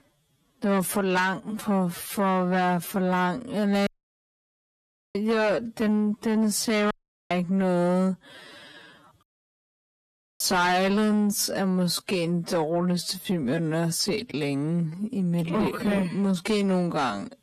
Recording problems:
wrong speed, natural pitch; too slow; 0.5 times normal speed
distortion; slight; 10 dB below the speech
audio cutting out; at 4 s for 1.5 s, at 7 s and at 9 s for 1 s

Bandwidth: 13.5 kHz